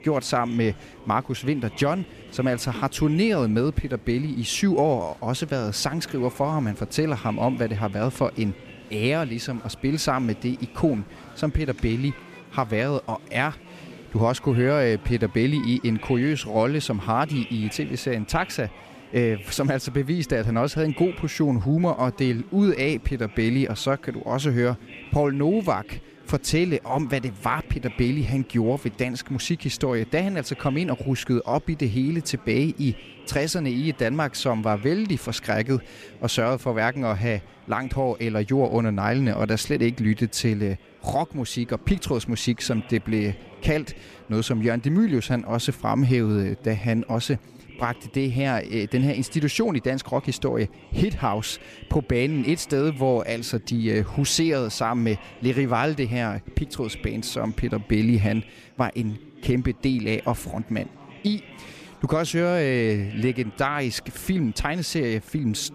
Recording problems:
chatter from many people; faint; throughout; 20 dB below the speech

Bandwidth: 14.5 kHz